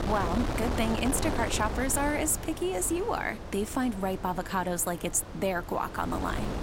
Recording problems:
wind noise on the microphone; heavy; 7 dB below the speech

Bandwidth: 16 kHz